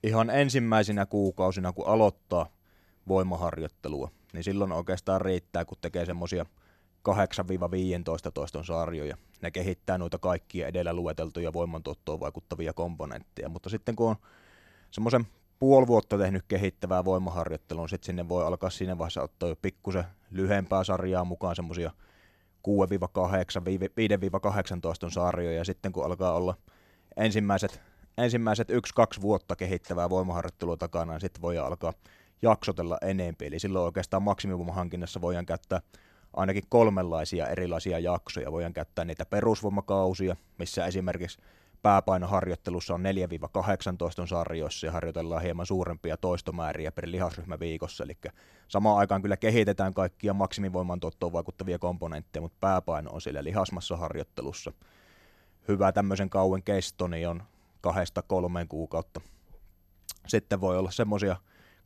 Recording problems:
none

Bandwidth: 14 kHz